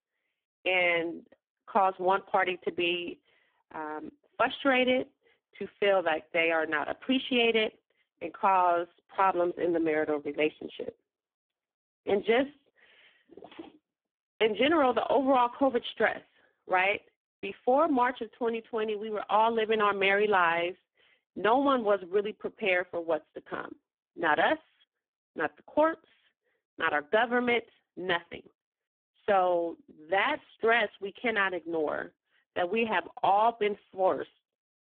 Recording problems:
phone-call audio; poor line

